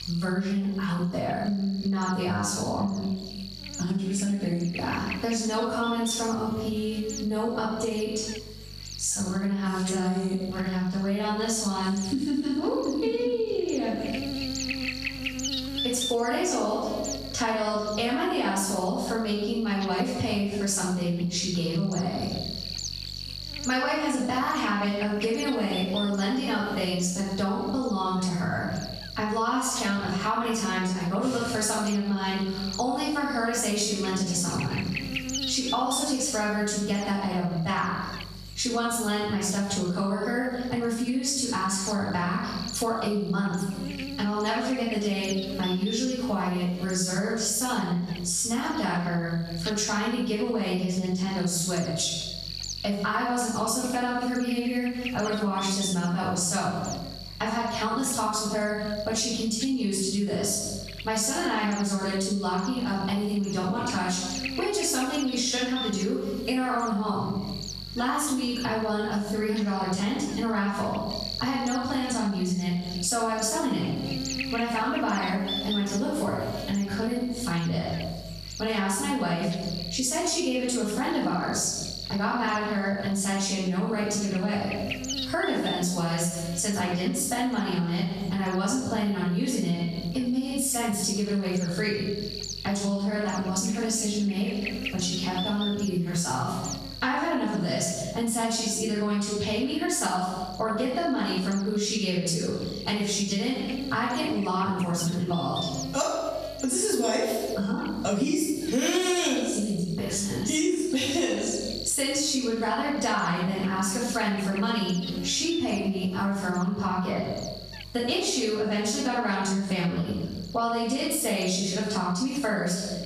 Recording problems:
off-mic speech; far
room echo; noticeable; dies away in 0.7 s
squashed, flat; somewhat
electrical hum; loud; throughout; 50 Hz, 10 dB below the speech

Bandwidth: 14.5 kHz